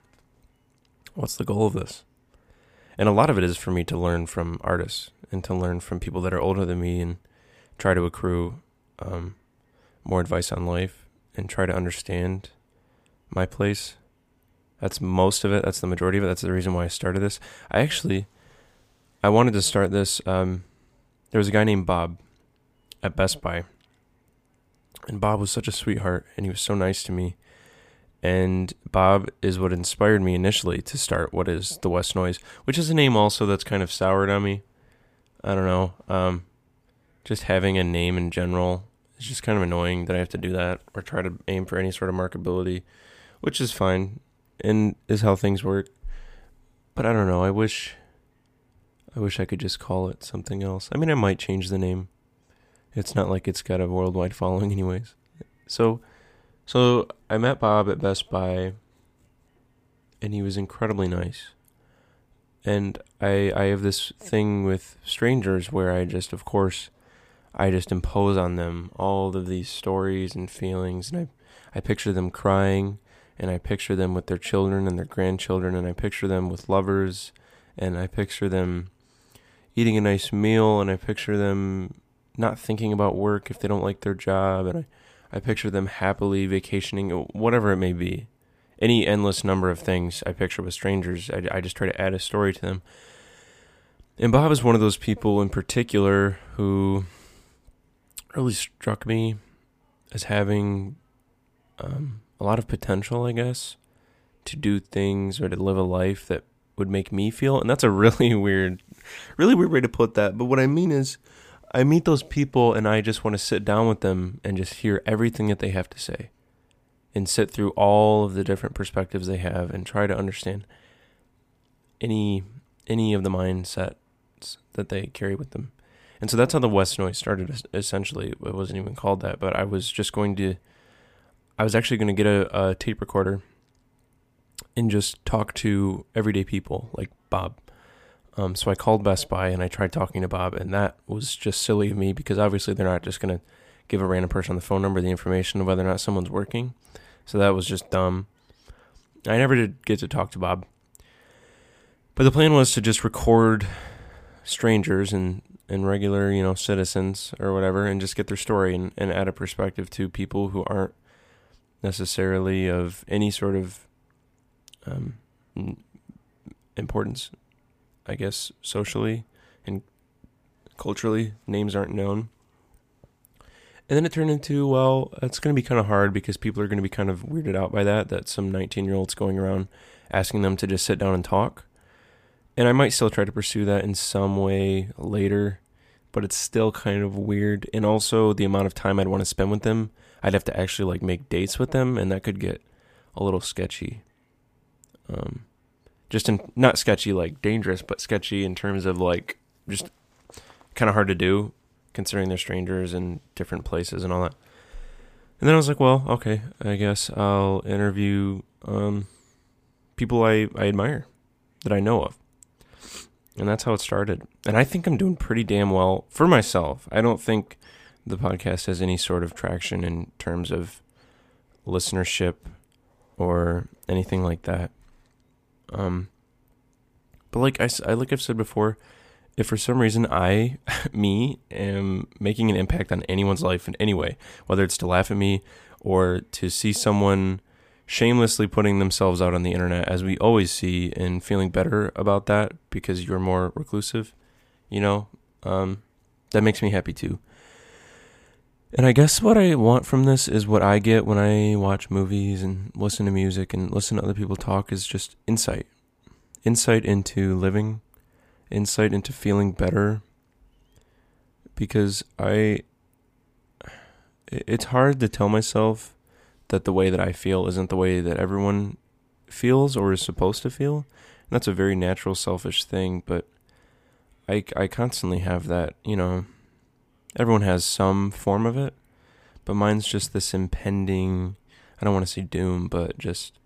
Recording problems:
none

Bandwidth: 15 kHz